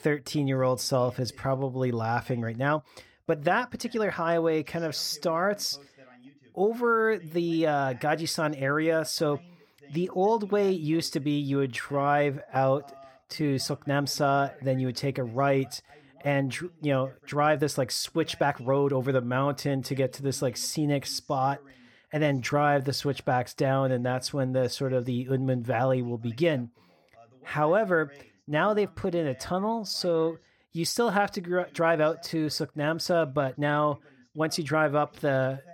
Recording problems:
voice in the background; faint; throughout; 30 dB below the speech
uneven, jittery; strongly; from 1 to 35 s

